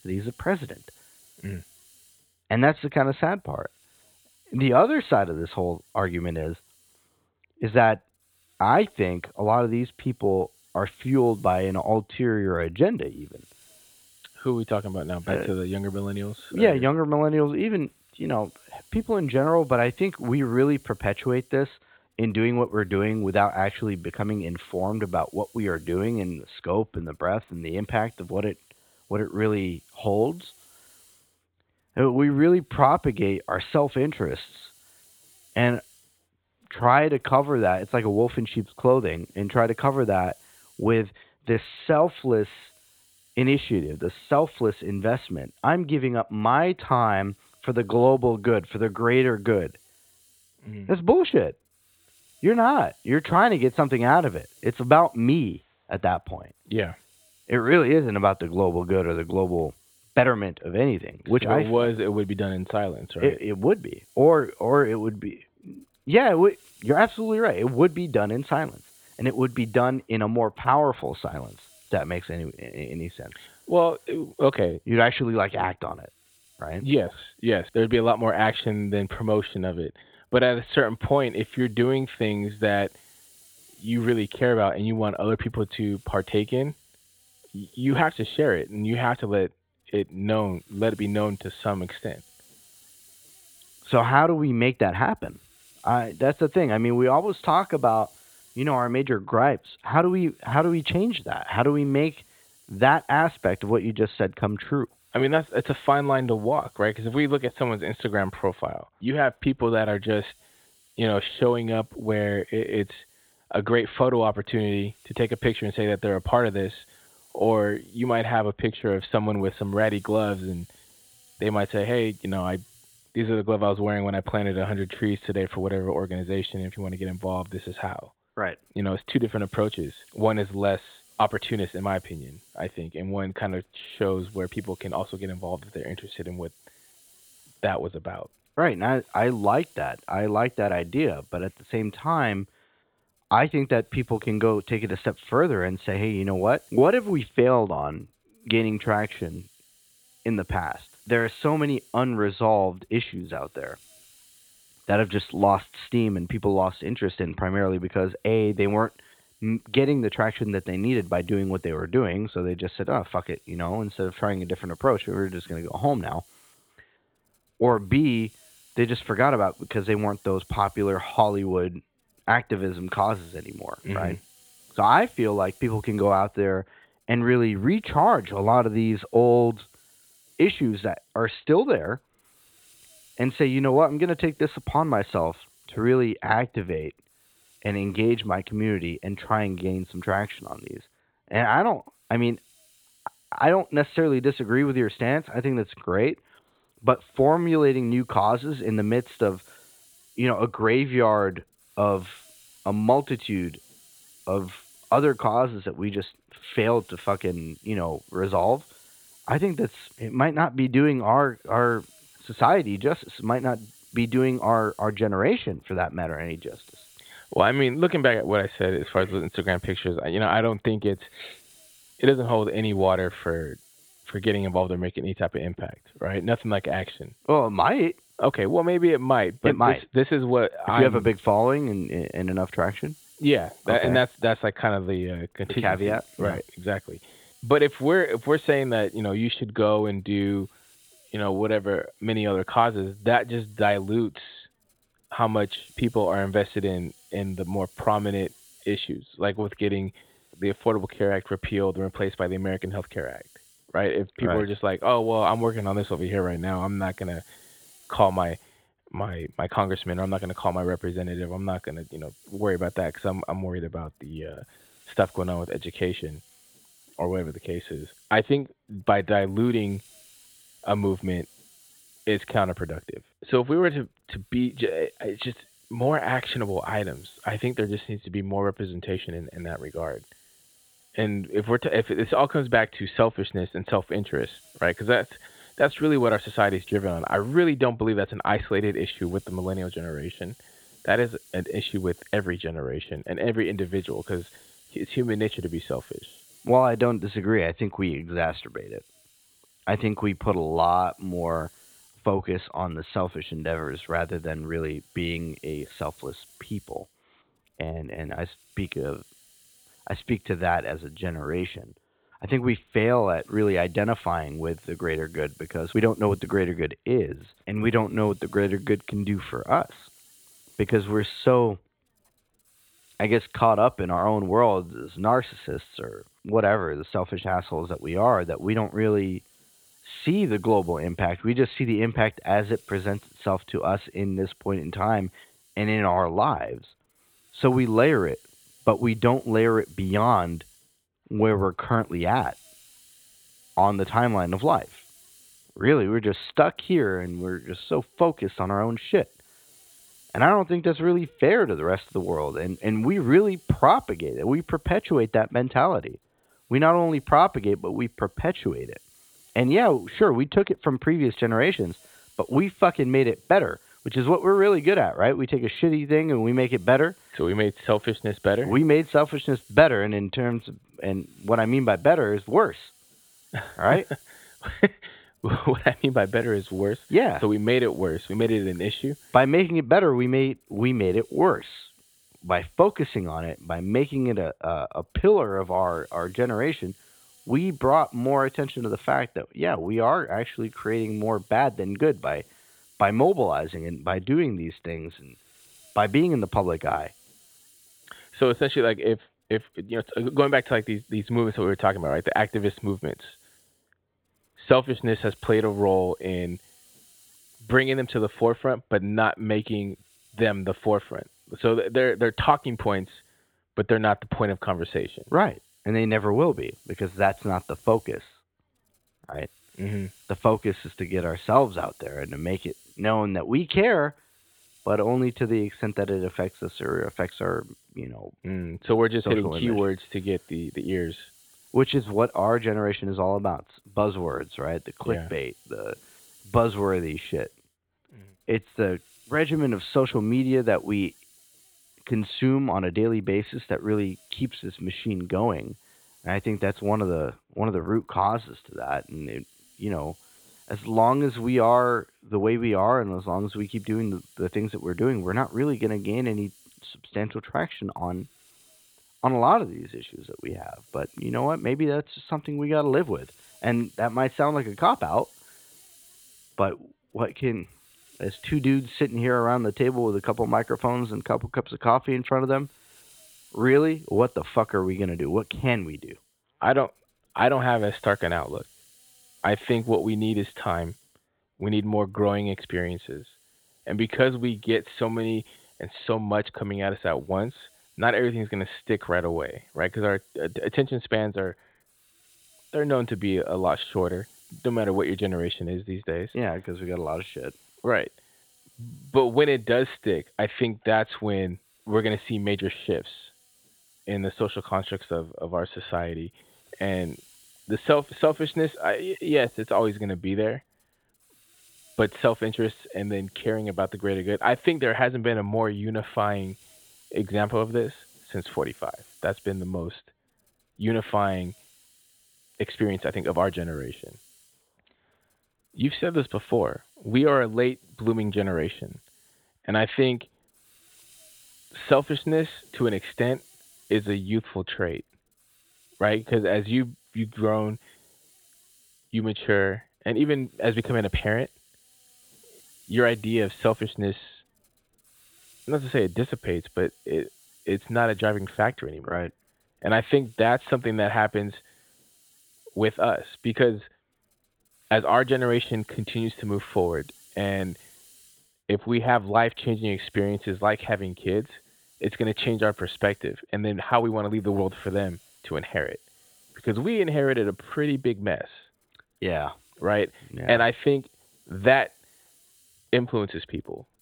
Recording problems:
high frequencies cut off; severe; nothing above 4 kHz
hiss; faint; throughout; 30 dB below the speech

